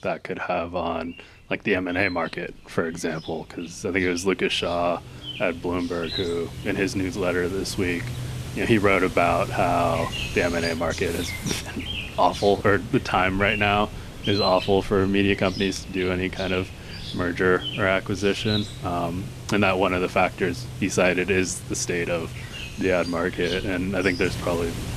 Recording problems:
animal sounds; loud; throughout; 10 dB below the speech

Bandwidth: 14 kHz